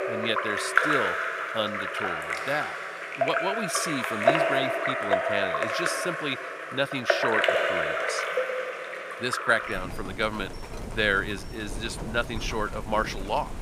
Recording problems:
rain or running water; very loud; throughout; 2 dB above the speech

